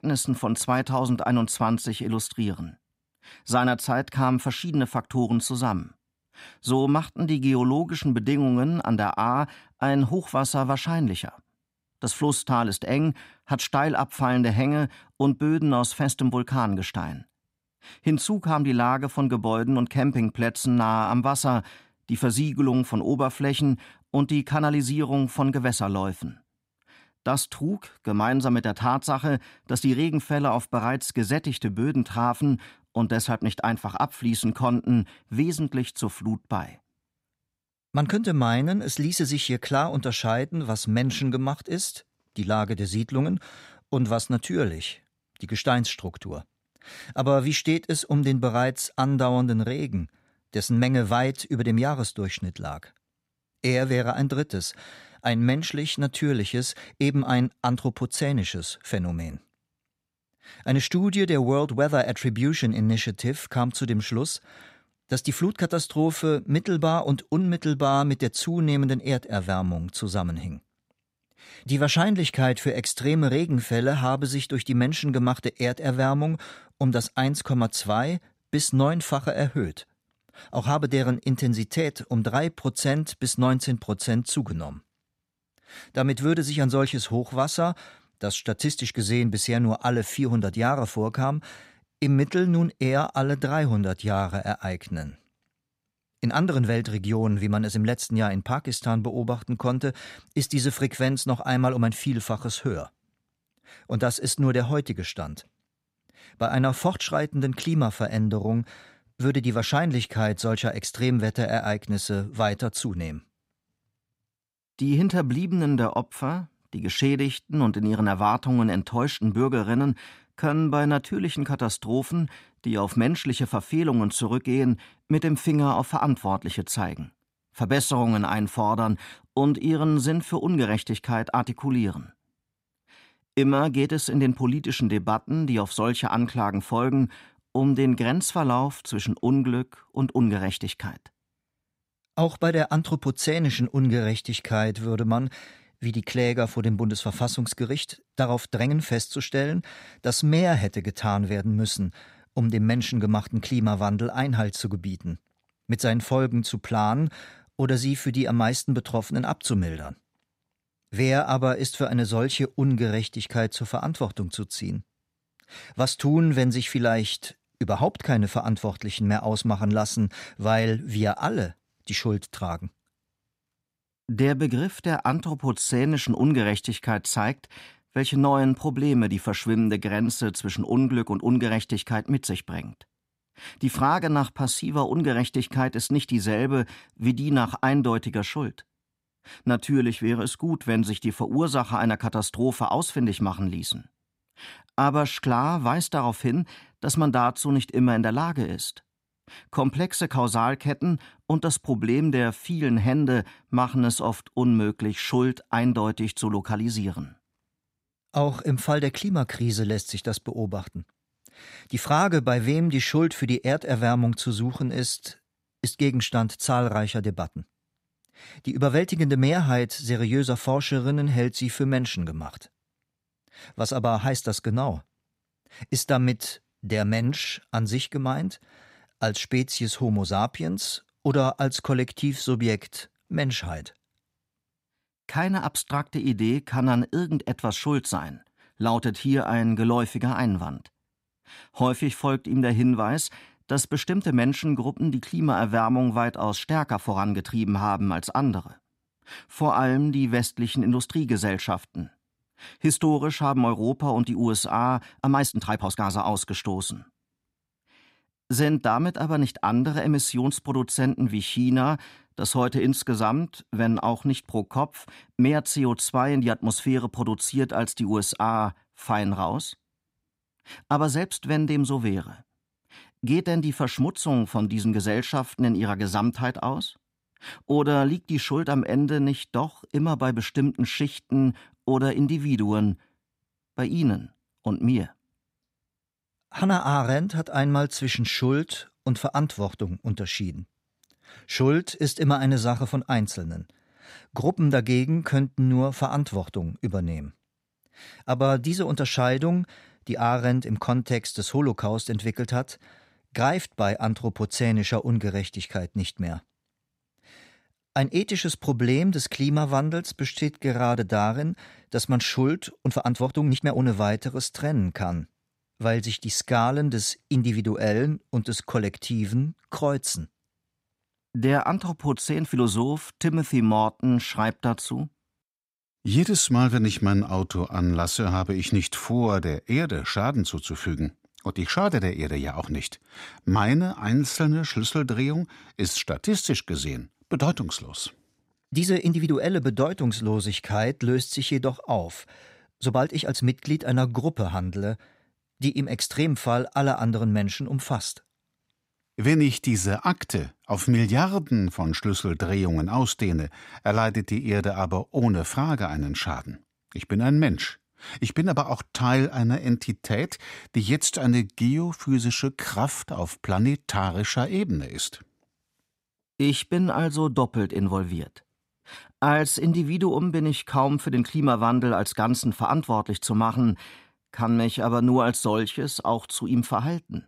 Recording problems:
uneven, jittery; strongly; from 7.5 s to 6:14

